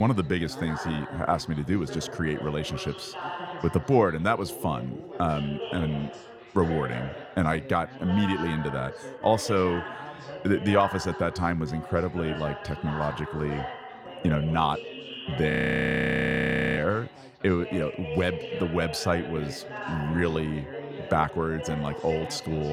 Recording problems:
background chatter; loud; throughout; 4 voices, 10 dB below the speech
abrupt cut into speech; at the start and the end
audio freezing; at 16 s for 1.5 s

